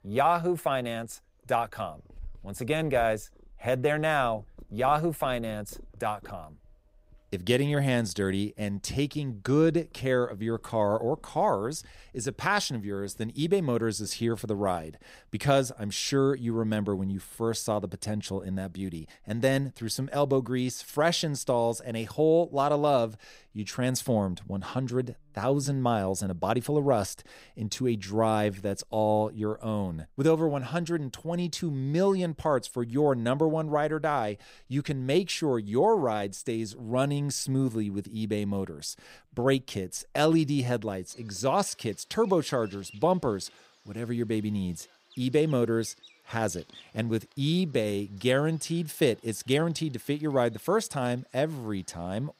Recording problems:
animal sounds; faint; throughout; 30 dB below the speech

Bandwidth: 15.5 kHz